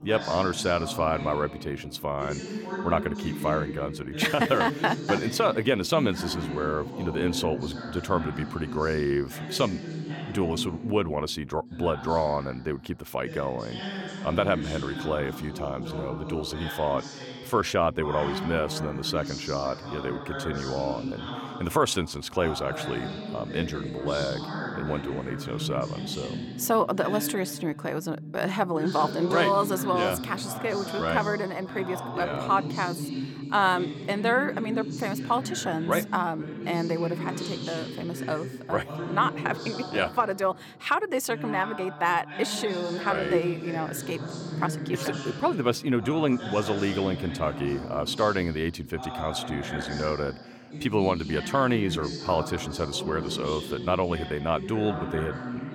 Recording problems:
voice in the background; loud; throughout; 7 dB below the speech

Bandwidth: 17 kHz